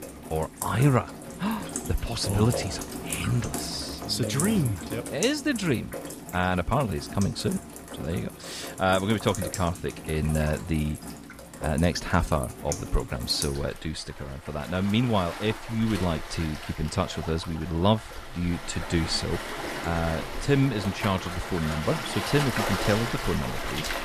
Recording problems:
rain or running water; loud; throughout; 7 dB below the speech

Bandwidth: 14.5 kHz